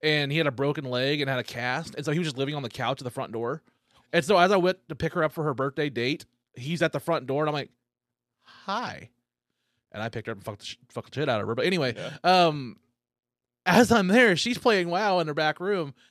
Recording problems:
none

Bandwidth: 13.5 kHz